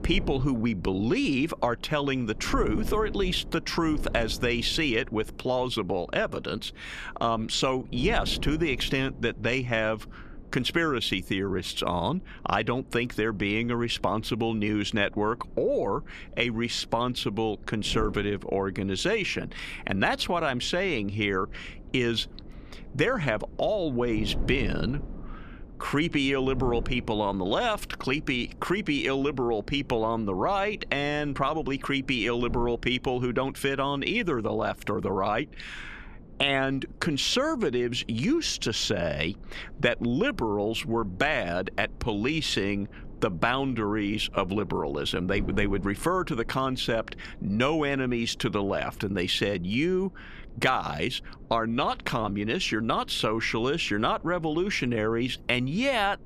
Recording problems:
wind noise on the microphone; occasional gusts; 25 dB below the speech

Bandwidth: 14 kHz